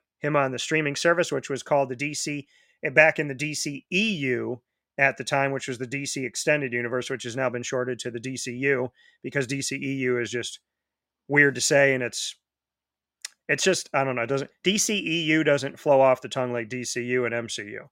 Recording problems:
none

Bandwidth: 16 kHz